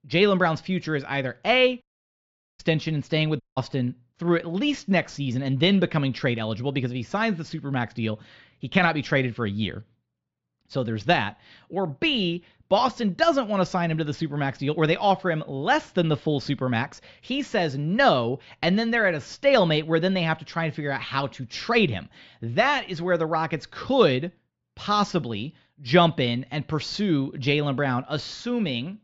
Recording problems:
muffled; very slightly; fading above 4 kHz
high frequencies cut off; slight; nothing above 8 kHz
audio cutting out; at 2 s for 1 s and at 3.5 s

